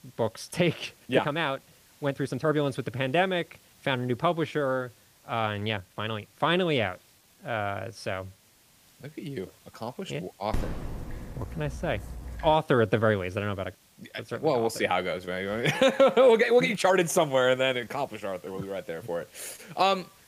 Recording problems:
hiss; faint; throughout; 30 dB below the speech
uneven, jittery; strongly; from 1 to 19 s
dog barking; noticeable; from 11 to 13 s; peak 8 dB below the speech

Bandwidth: 15 kHz